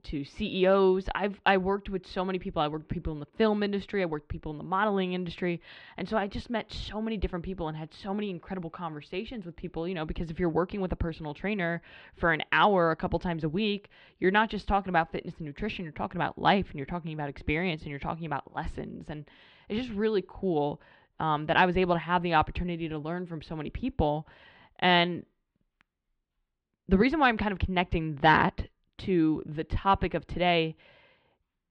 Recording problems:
muffled; slightly; fading above 3.5 kHz

